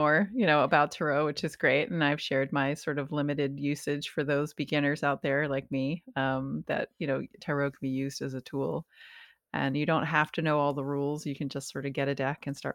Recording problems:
abrupt cut into speech; at the start

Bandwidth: 17.5 kHz